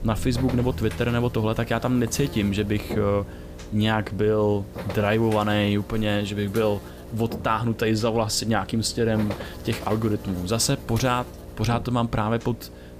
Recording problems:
electrical hum; noticeable; throughout; 60 Hz, 15 dB below the speech
background music; noticeable; throughout; 20 dB below the speech

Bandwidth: 15 kHz